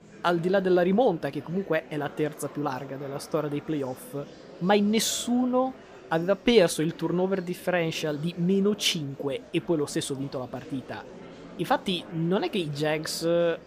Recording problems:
murmuring crowd; noticeable; throughout; 20 dB below the speech

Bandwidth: 15 kHz